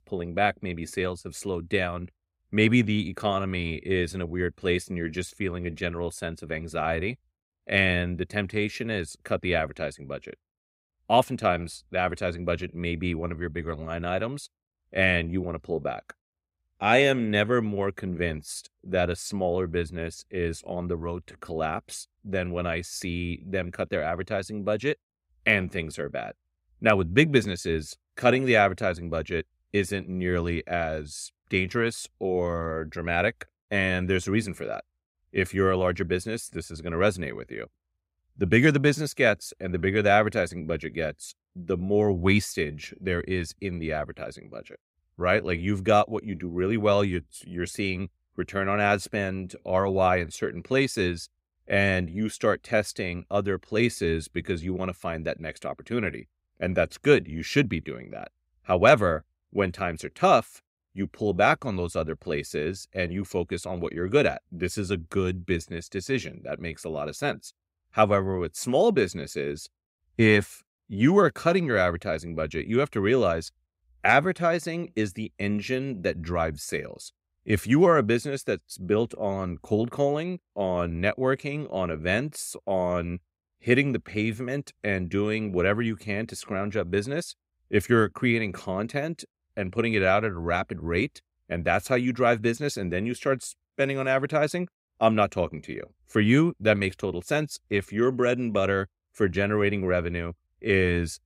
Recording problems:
none

